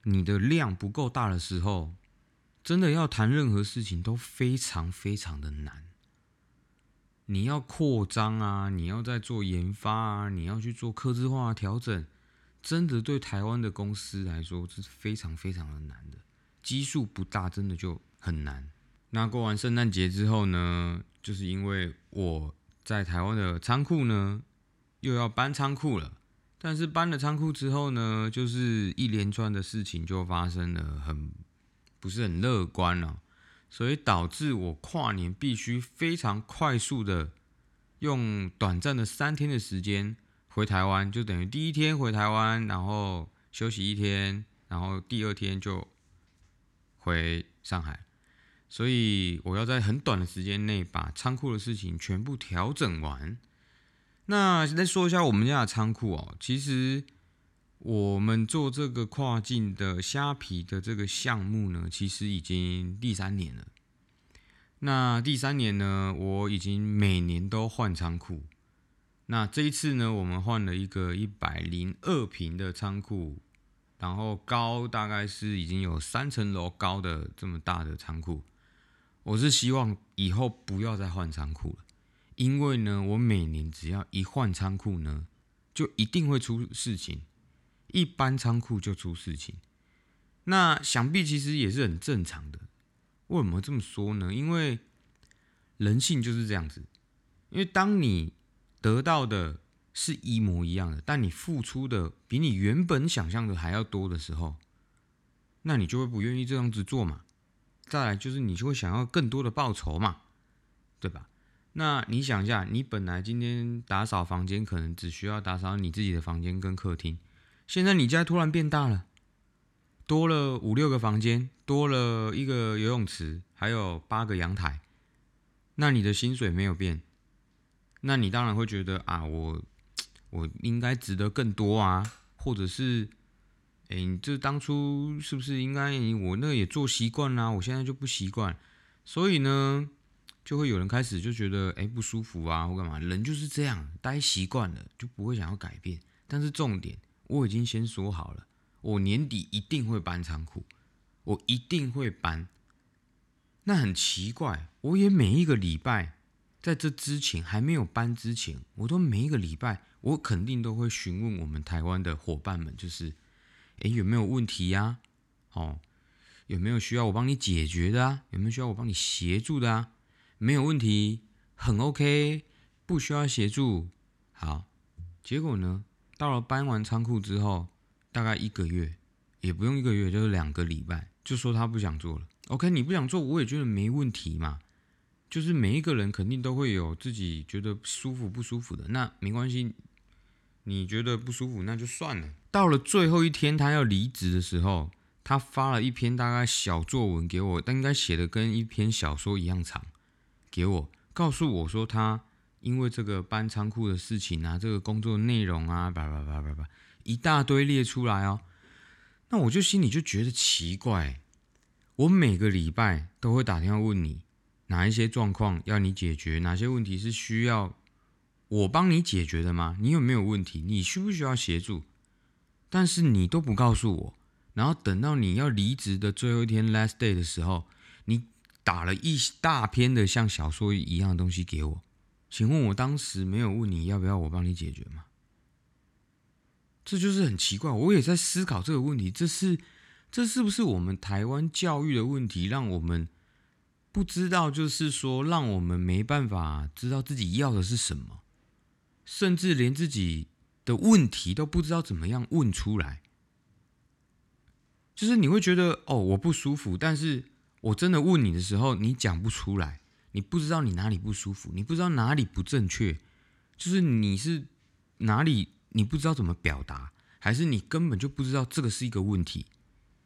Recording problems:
none

